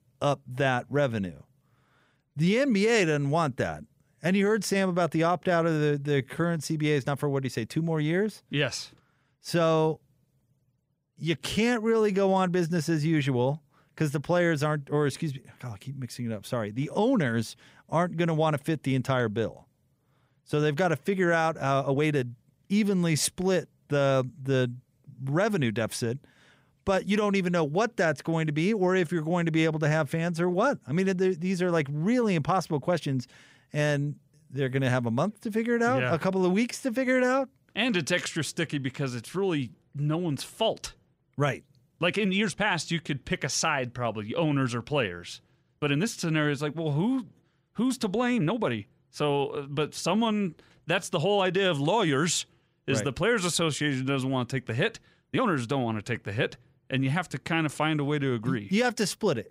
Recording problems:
uneven, jittery; strongly; from 2 to 55 s

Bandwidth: 15.5 kHz